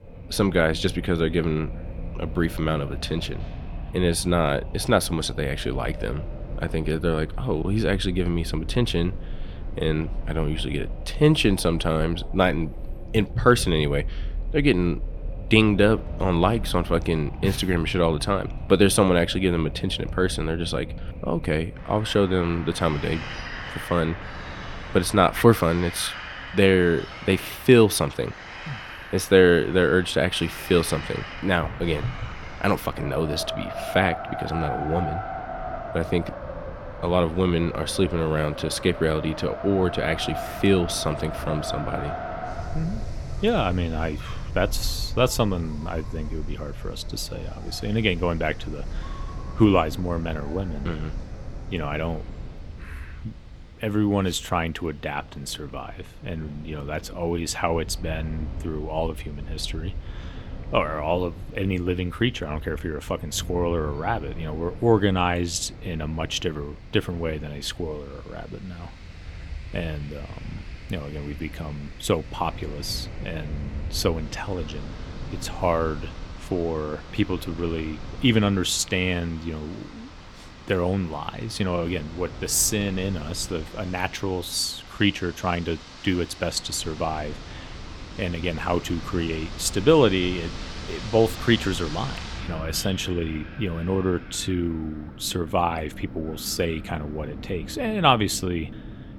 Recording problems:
wind in the background; noticeable; throughout; 10 dB below the speech

